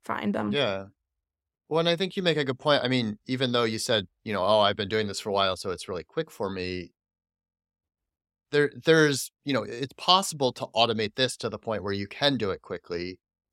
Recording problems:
none

